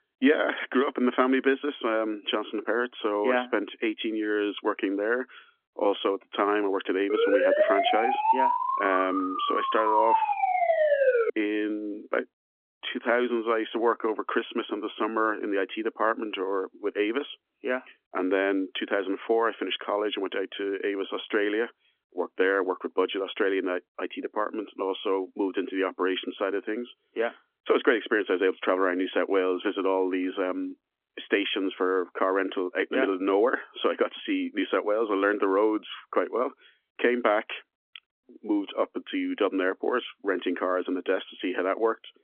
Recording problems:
phone-call audio; nothing above 3.5 kHz
siren; loud; from 7 to 11 s; peak 5 dB above the speech

